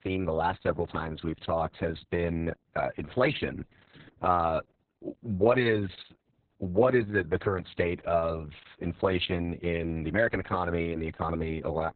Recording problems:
garbled, watery; badly; nothing above 4 kHz

